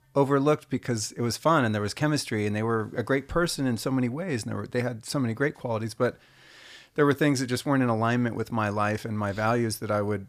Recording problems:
none

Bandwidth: 14.5 kHz